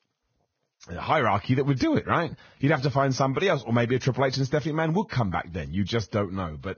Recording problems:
garbled, watery; badly; nothing above 6.5 kHz

